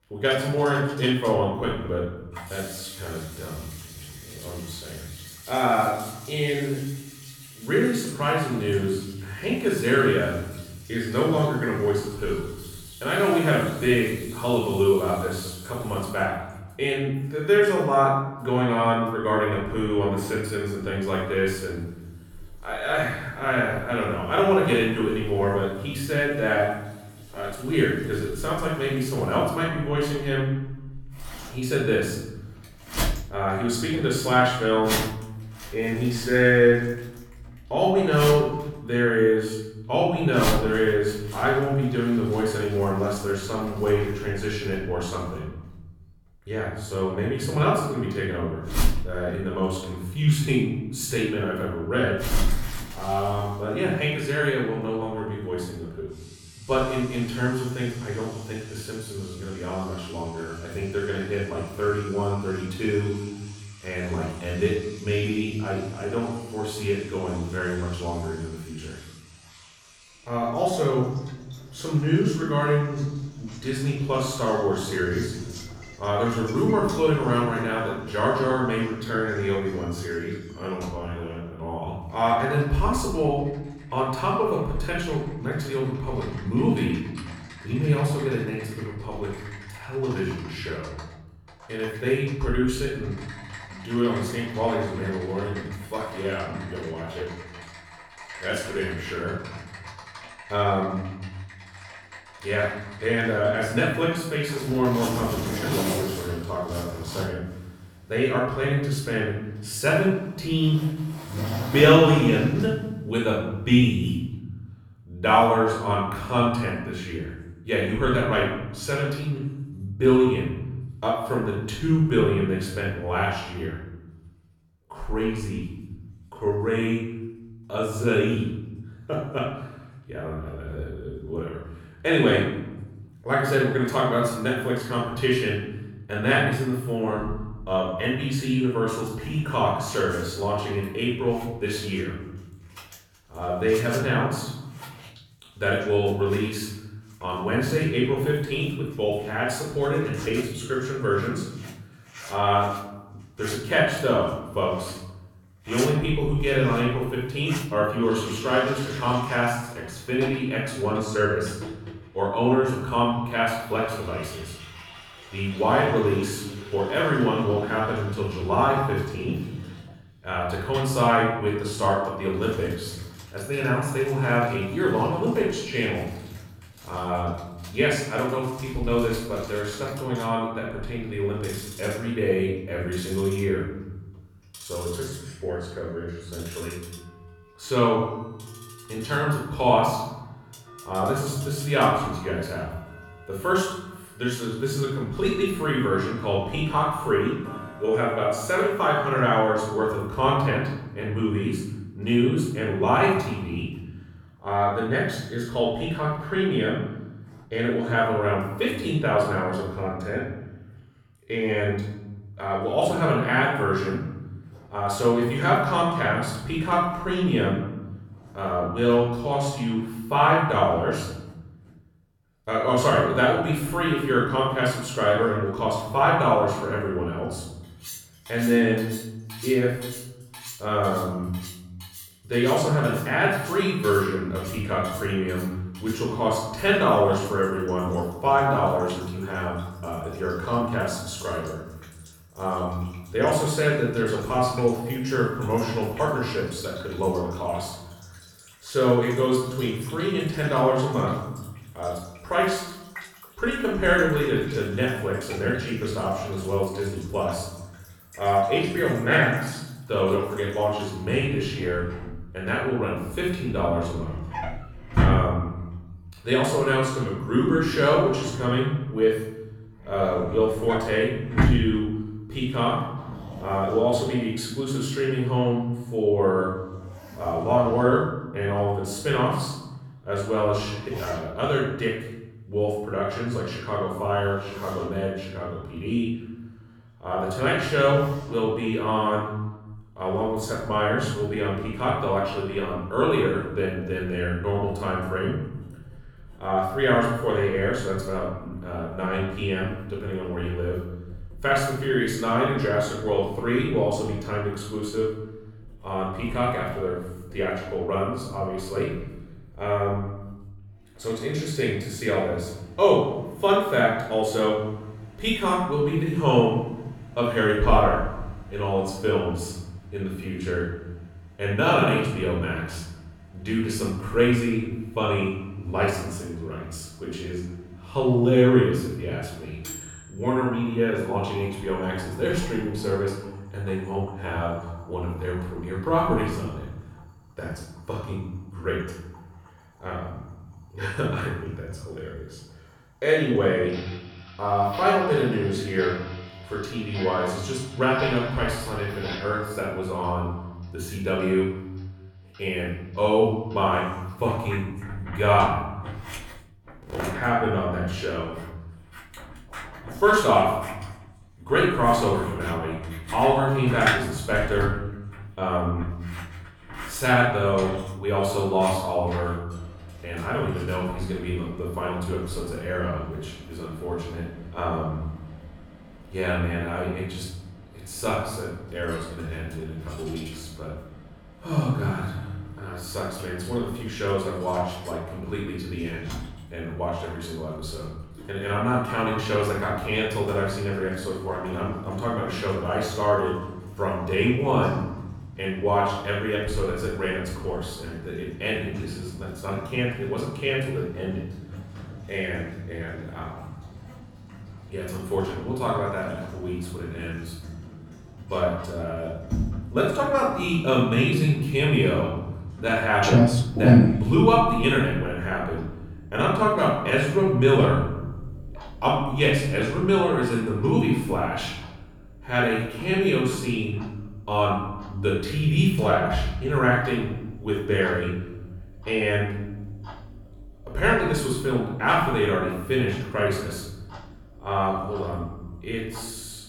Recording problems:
off-mic speech; far
room echo; noticeable; dies away in 1.1 s
household noises; noticeable; throughout; 10 dB below the speech

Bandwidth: 17.5 kHz